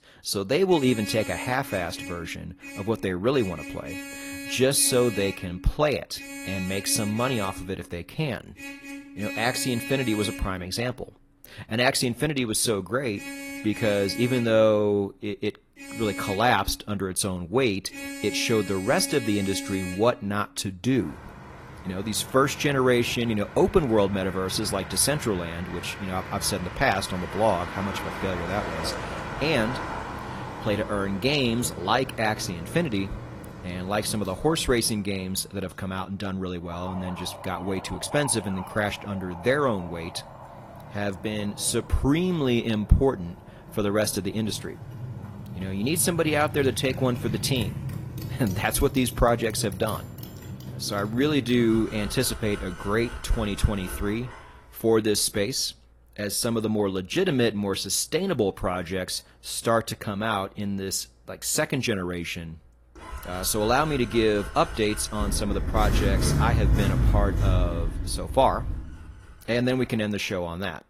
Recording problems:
garbled, watery; slightly
traffic noise; loud; throughout; 9 dB below the speech

